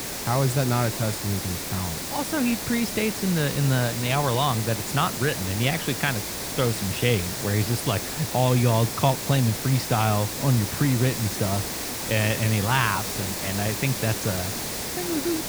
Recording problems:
hiss; loud; throughout; 4 dB below the speech

